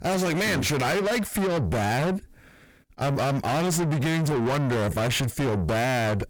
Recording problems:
distortion; heavy; 5 dB below the speech

